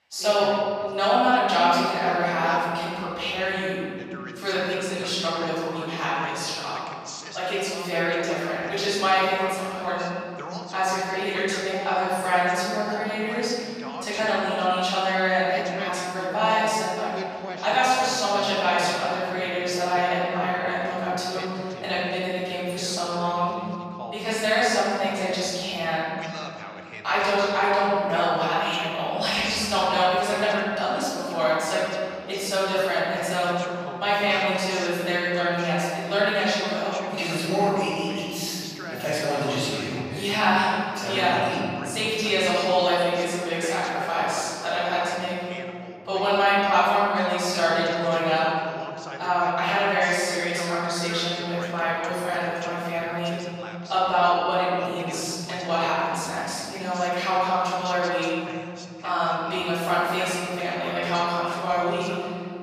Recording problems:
room echo; strong; dies away in 2.7 s
off-mic speech; far
thin; somewhat; fading below 1 kHz
muffled; very slightly; fading above 3.5 kHz
voice in the background; noticeable; throughout; 15 dB below the speech

